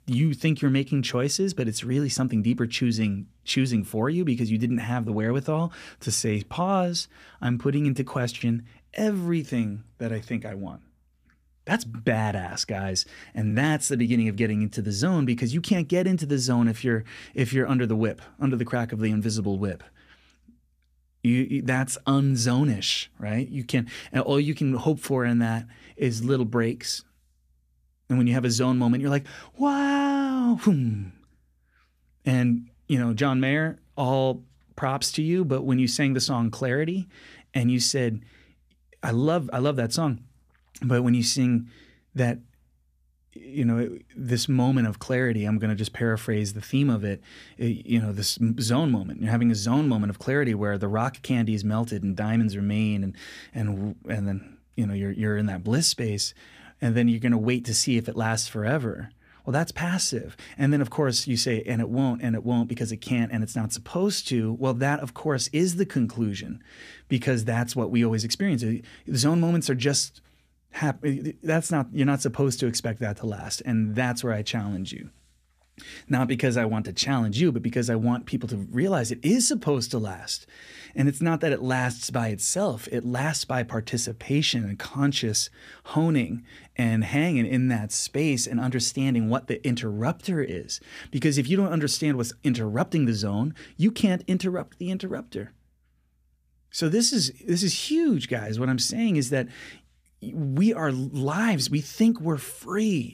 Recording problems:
none

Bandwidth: 14.5 kHz